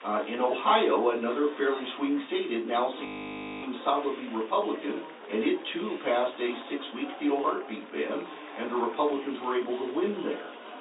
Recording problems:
off-mic speech; far
high frequencies cut off; severe; nothing above 4 kHz
room echo; very slight; dies away in 0.3 s
thin; very slightly; fading below 250 Hz
murmuring crowd; noticeable; throughout; 15 dB below the speech
audio freezing; at 3 s for 0.5 s

